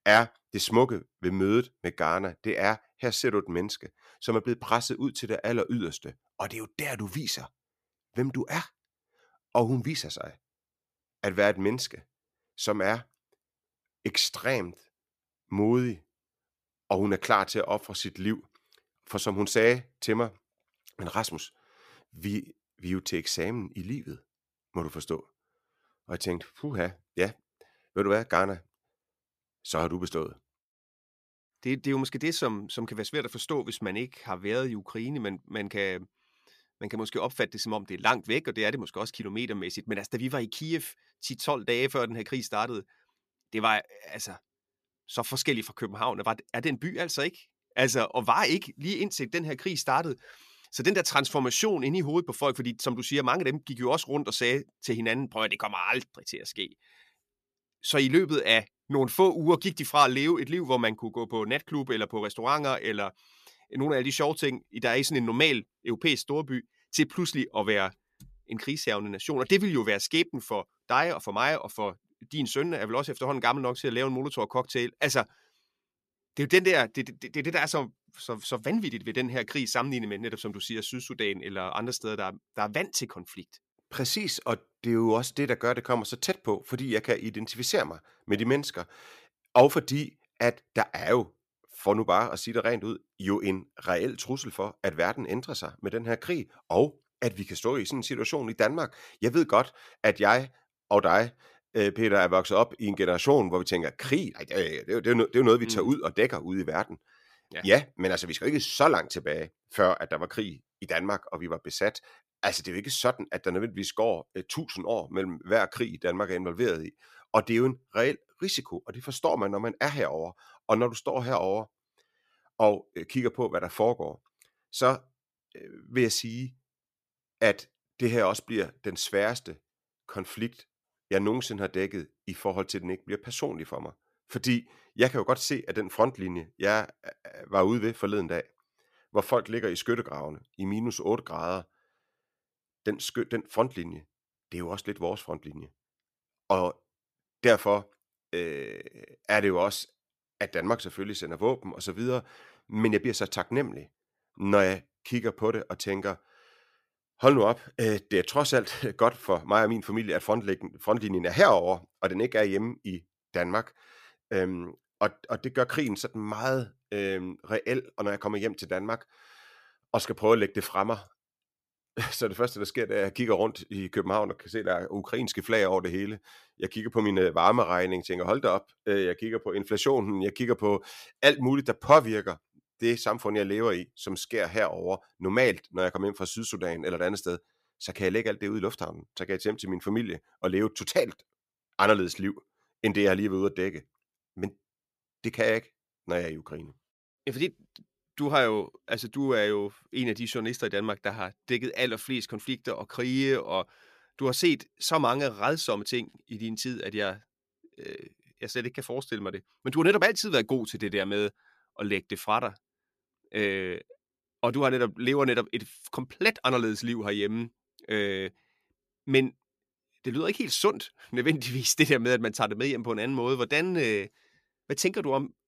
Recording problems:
none

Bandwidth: 14.5 kHz